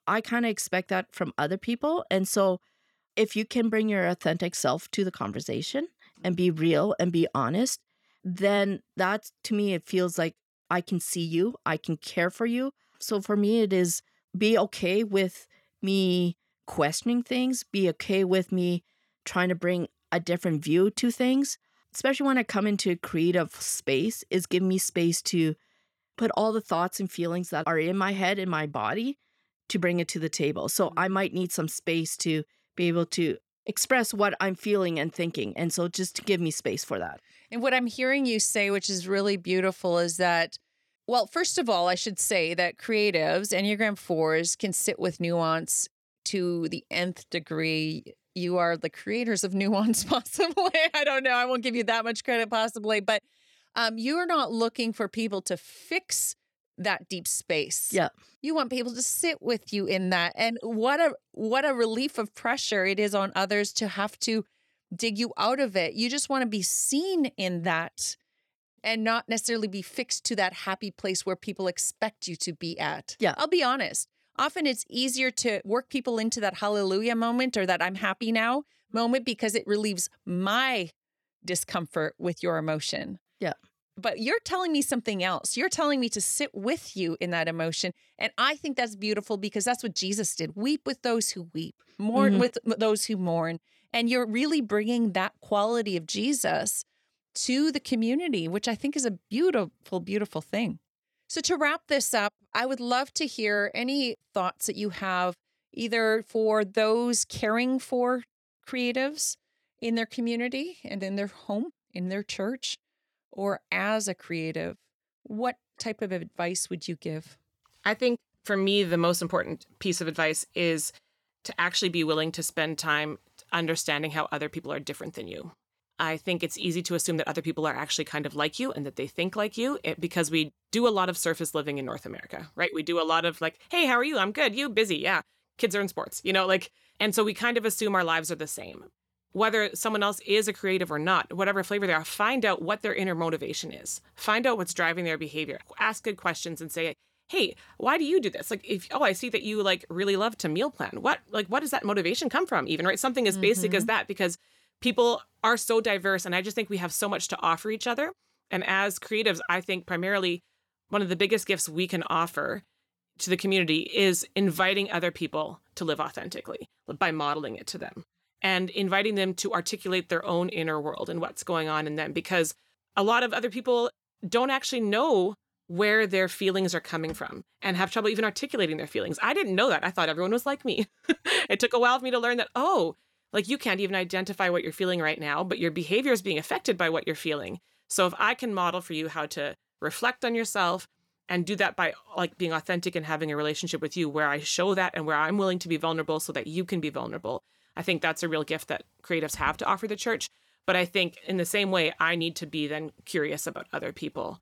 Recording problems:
uneven, jittery; slightly; from 5 s to 1:52

